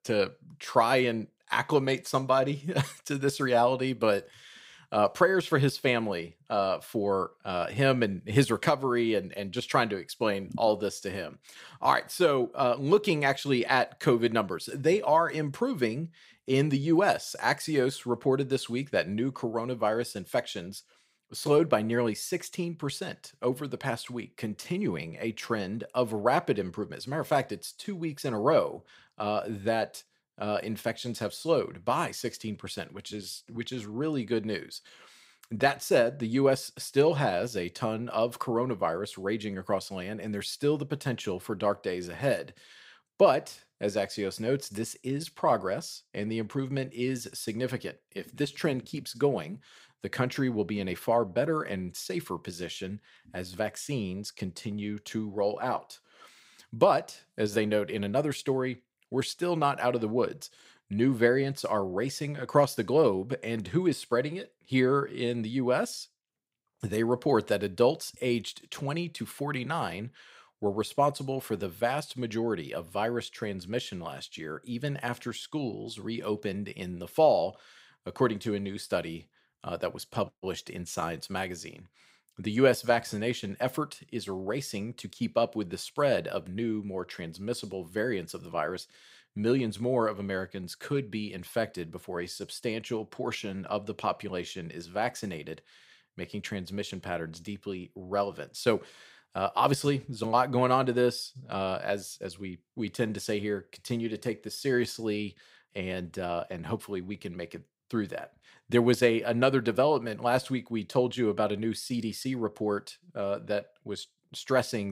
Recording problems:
abrupt cut into speech; at the end

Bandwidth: 15.5 kHz